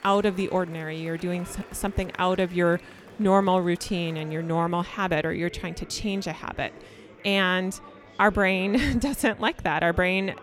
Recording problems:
chatter from many people; faint; throughout; 20 dB below the speech

